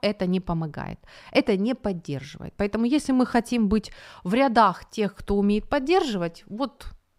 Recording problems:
none

